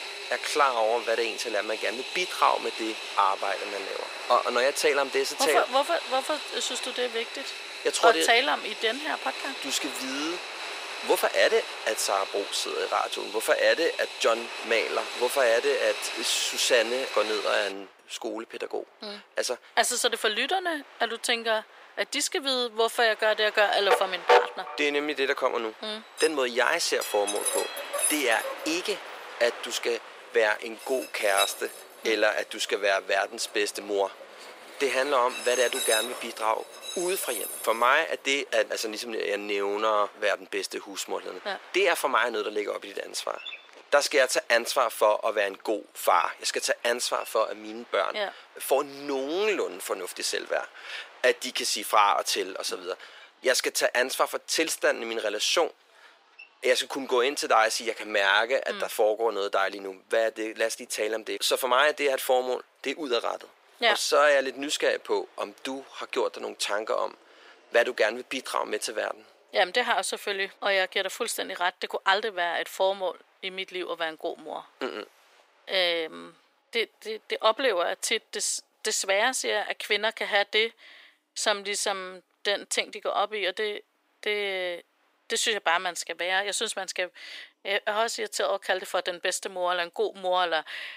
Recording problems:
thin; very; fading below 400 Hz
train or aircraft noise; loud; throughout; 7 dB below the speech

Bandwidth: 15.5 kHz